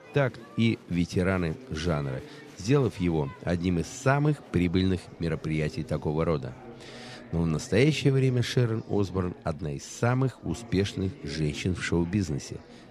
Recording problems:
murmuring crowd; noticeable; throughout; 20 dB below the speech

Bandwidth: 14 kHz